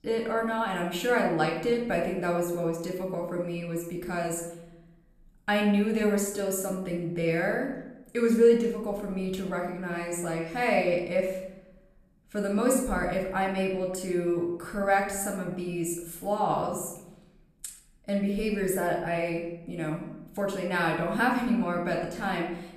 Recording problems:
room echo; noticeable; dies away in 0.8 s
off-mic speech; somewhat distant

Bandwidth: 14 kHz